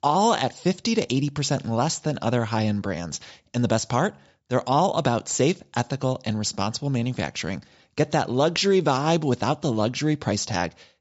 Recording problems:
high frequencies cut off; noticeable; nothing above 8 kHz

